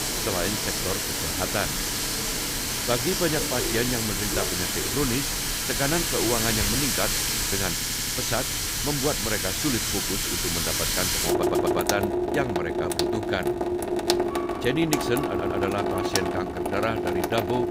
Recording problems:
household noises; very loud; throughout; 4 dB above the speech
animal sounds; noticeable; throughout; 20 dB below the speech
train or aircraft noise; noticeable; throughout; 10 dB below the speech
audio stuttering; at 7.5 s, at 11 s and at 15 s

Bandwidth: 15.5 kHz